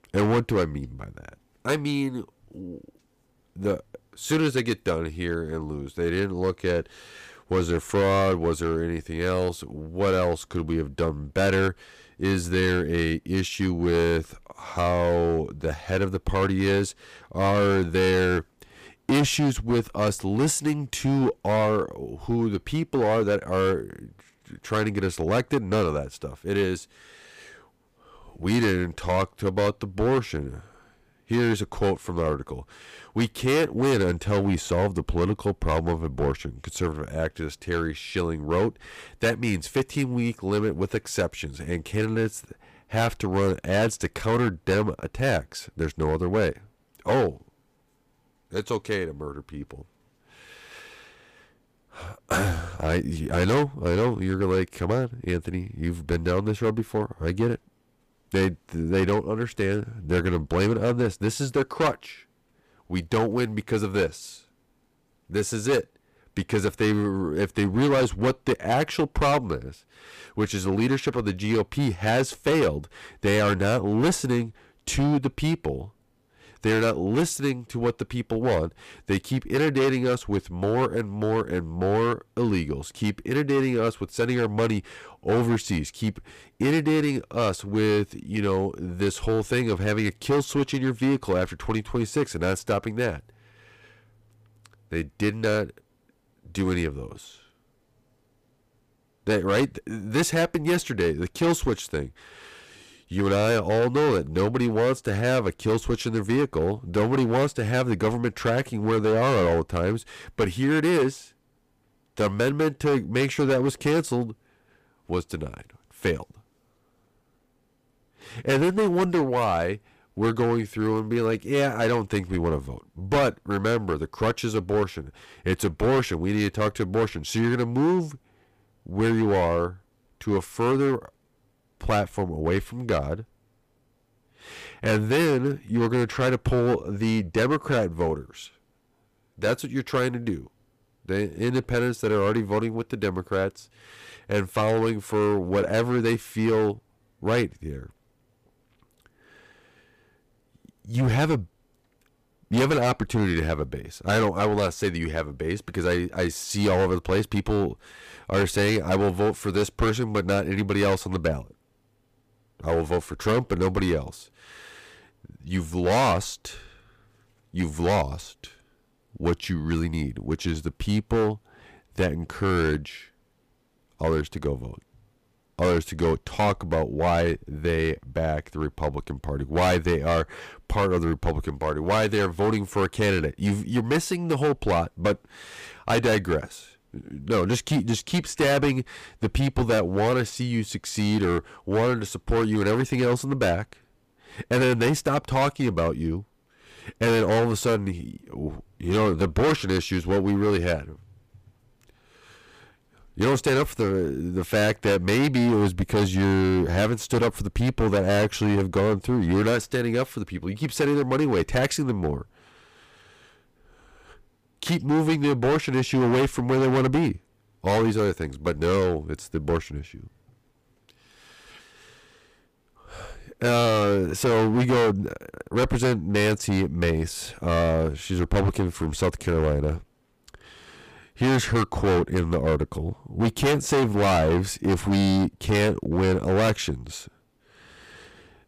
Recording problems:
distortion; heavy; 9% of the sound clipped

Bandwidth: 15 kHz